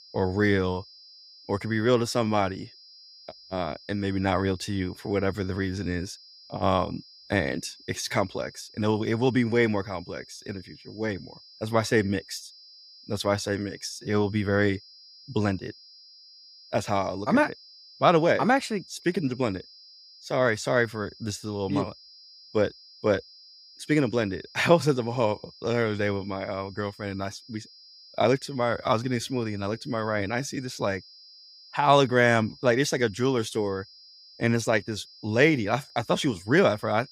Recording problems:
high-pitched whine; faint; throughout; 5 kHz, 20 dB below the speech

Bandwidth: 15.5 kHz